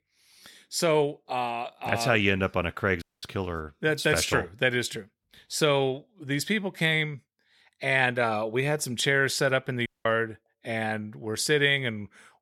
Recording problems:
audio cutting out; at 3 s and at 10 s

